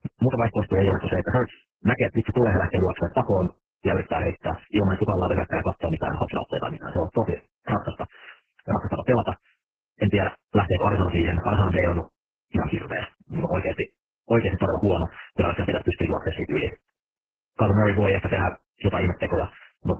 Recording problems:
garbled, watery; badly; nothing above 3 kHz
wrong speed, natural pitch; too fast; 1.6 times normal speed

